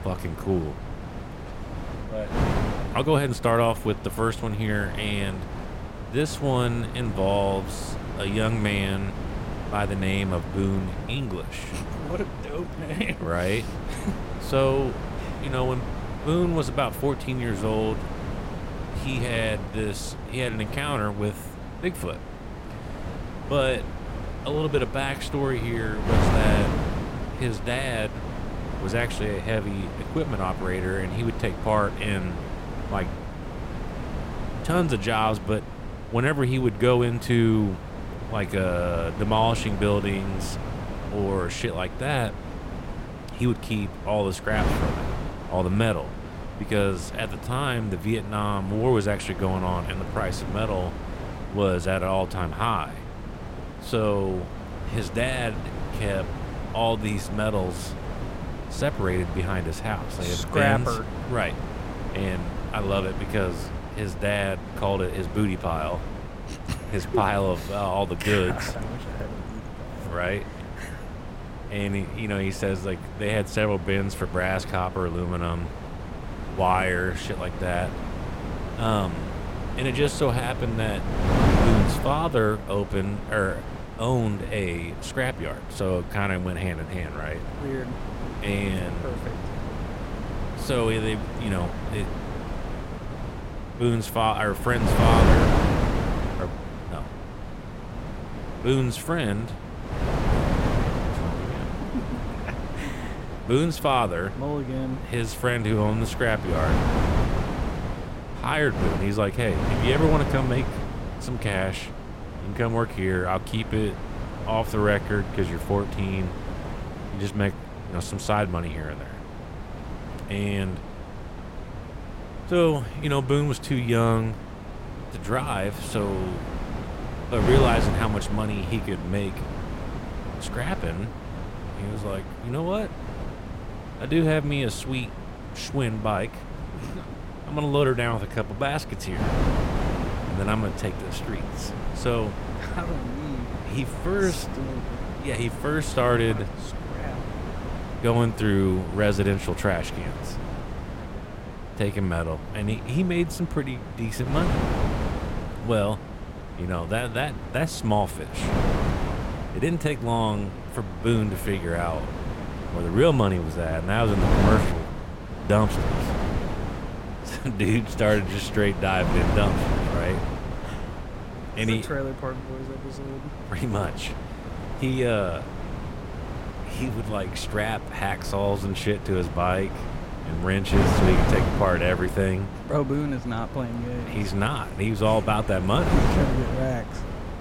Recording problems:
wind noise on the microphone; heavy; 7 dB below the speech

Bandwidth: 16 kHz